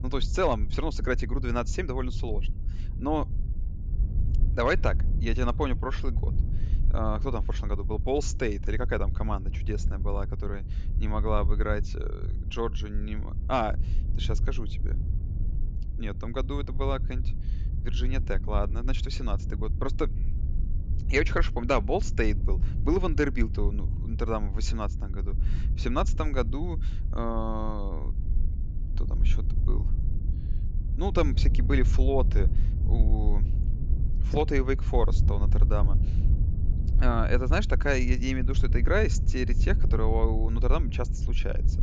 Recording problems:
wind noise on the microphone; occasional gusts; 15 dB below the speech
low rumble; faint; throughout; 20 dB below the speech

